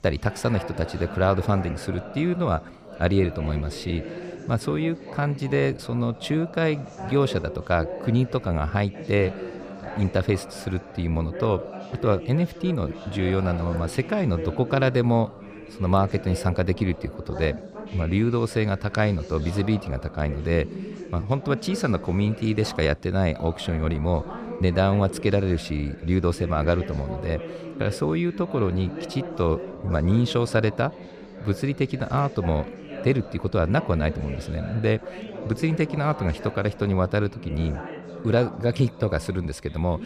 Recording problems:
background chatter; noticeable; throughout; 4 voices, 10 dB below the speech

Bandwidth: 15 kHz